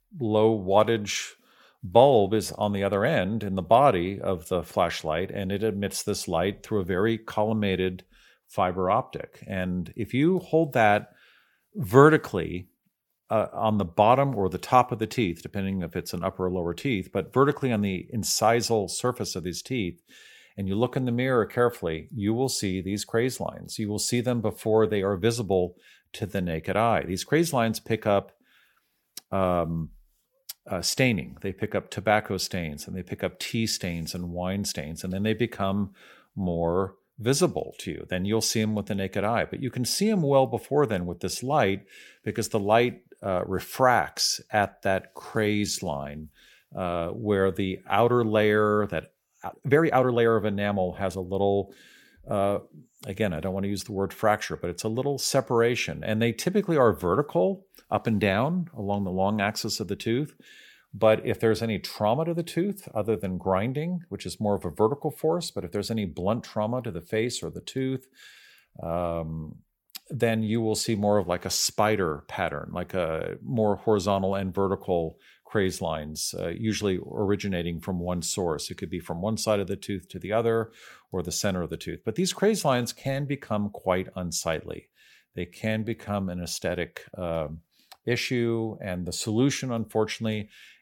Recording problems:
uneven, jittery; strongly; from 26 s to 1:26

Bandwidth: 18 kHz